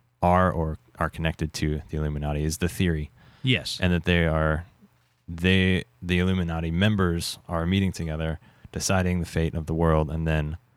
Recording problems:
none

